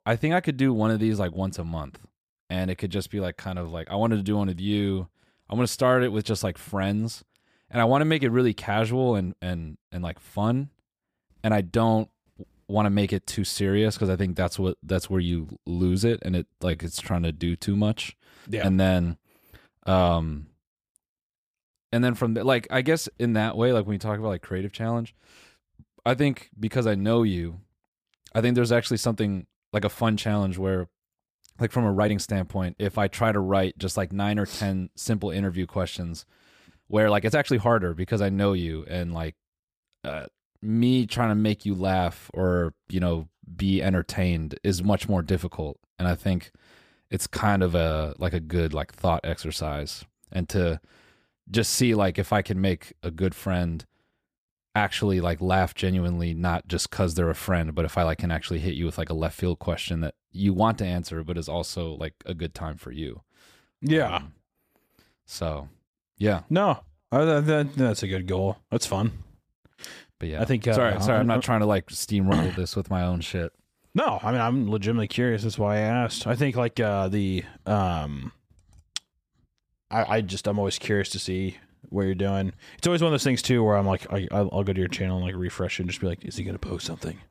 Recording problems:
uneven, jittery; strongly; from 3 s to 1:18

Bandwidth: 15 kHz